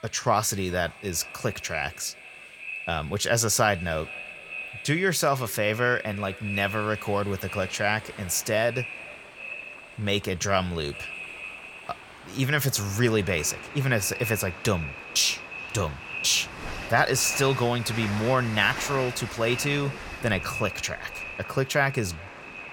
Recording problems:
echo of what is said; strong; throughout; 420 ms later, 10 dB below the speech
train or aircraft noise; noticeable; throughout; 15 dB below the speech
household noises; faint; from 9 s on; 25 dB below the speech

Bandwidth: 17.5 kHz